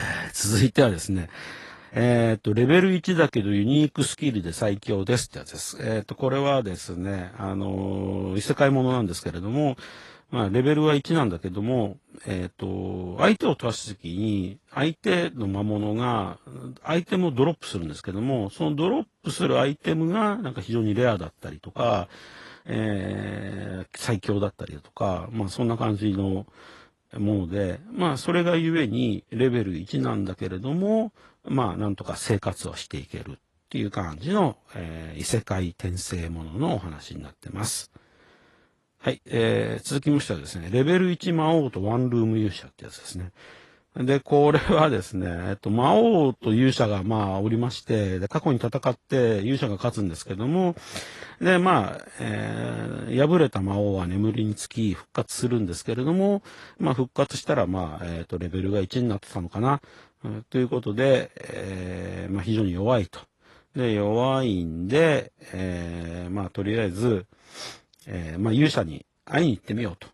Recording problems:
garbled, watery; slightly; nothing above 11.5 kHz
abrupt cut into speech; at the start

